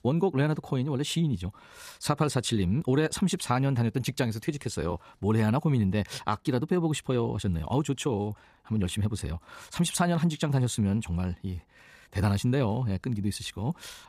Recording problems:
wrong speed, natural pitch; too fast; 1.5 times normal speed

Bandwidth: 14.5 kHz